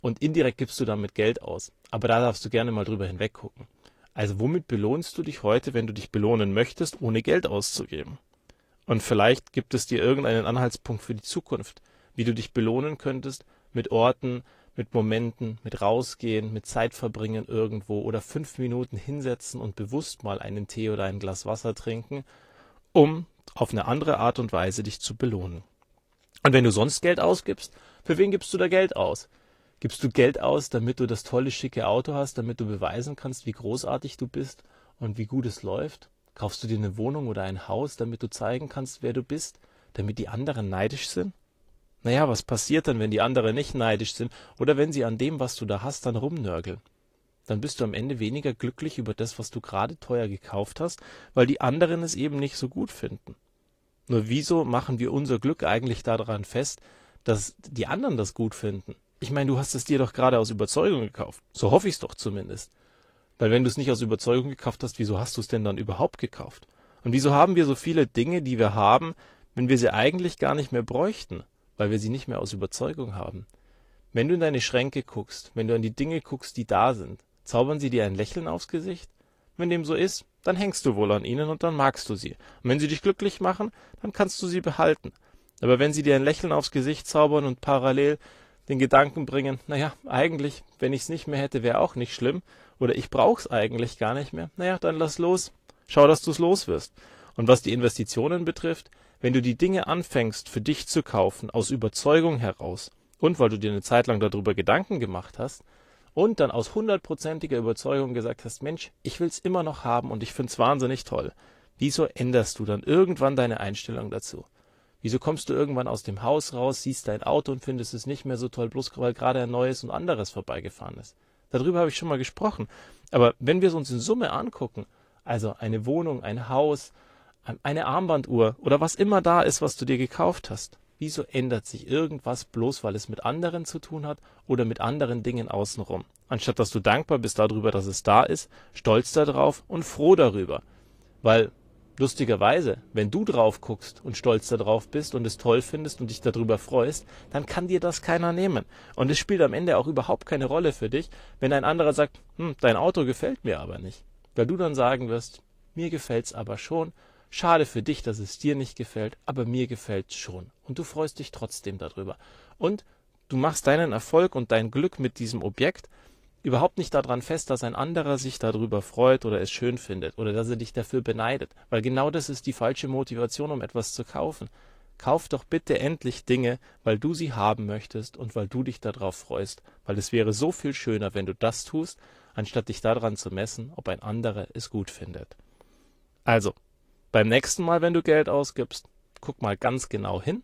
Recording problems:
garbled, watery; slightly; nothing above 14.5 kHz

